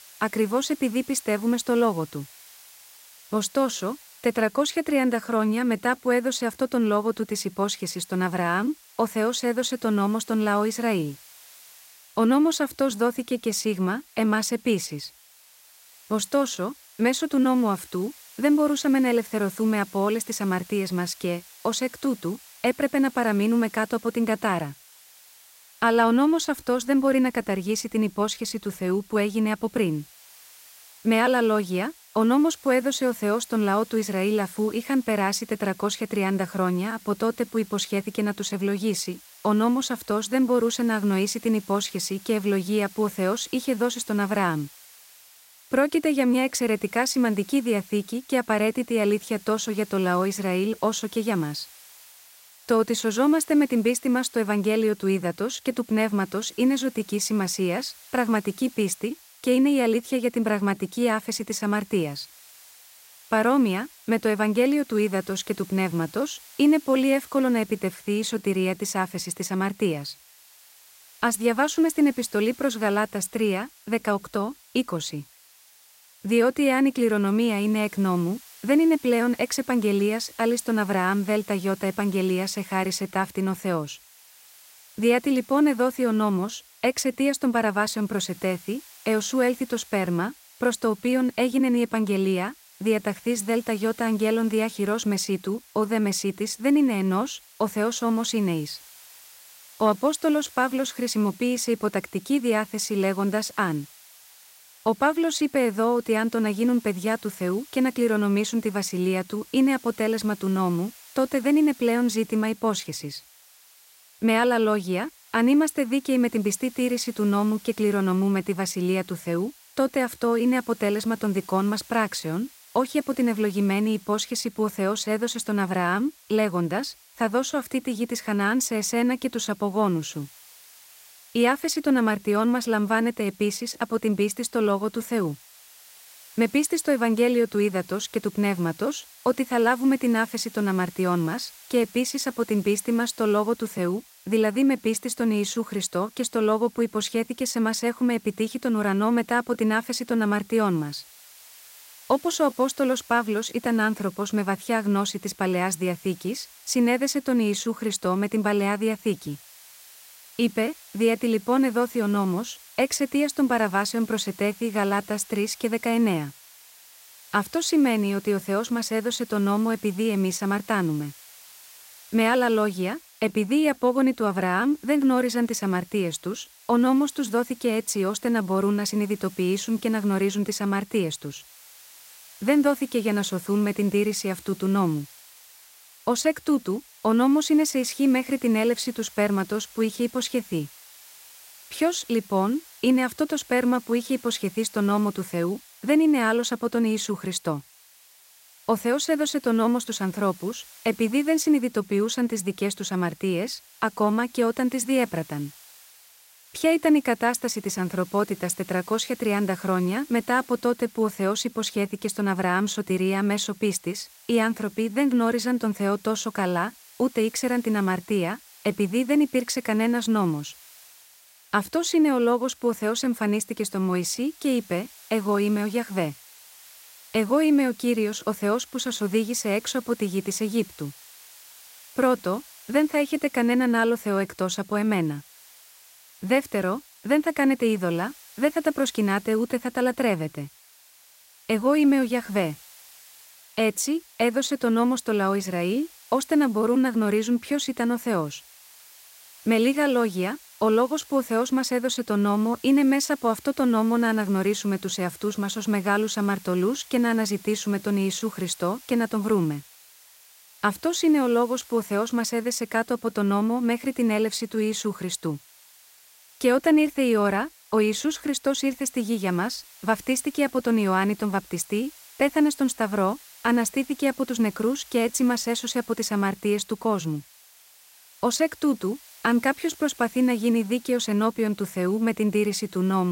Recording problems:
hiss; faint; throughout; 25 dB below the speech
abrupt cut into speech; at the end

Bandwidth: 16 kHz